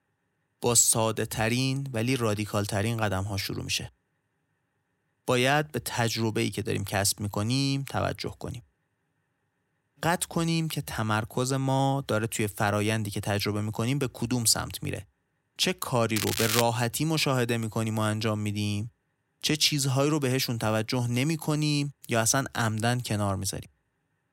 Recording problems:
crackling; loud; at 16 s; 2 dB below the speech

